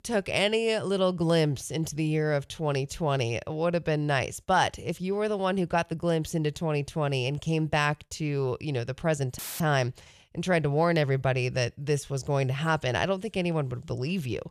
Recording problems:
audio cutting out; filled with static; at 9.5 s

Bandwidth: 14.5 kHz